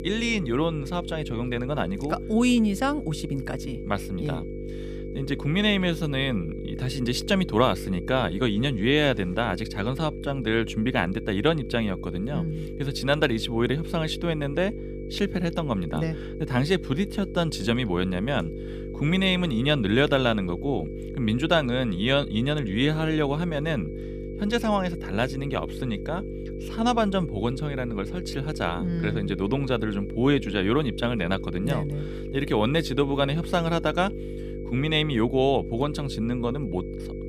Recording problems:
electrical hum; noticeable; throughout; 50 Hz, 10 dB below the speech
high-pitched whine; faint; throughout; 2.5 kHz, 30 dB below the speech

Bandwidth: 15 kHz